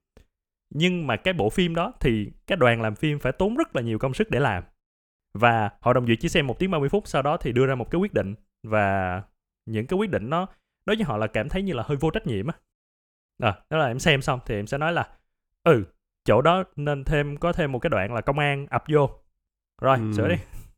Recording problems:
none

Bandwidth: 18.5 kHz